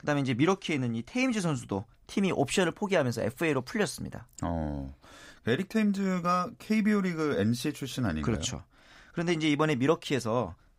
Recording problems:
none

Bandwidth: 15.5 kHz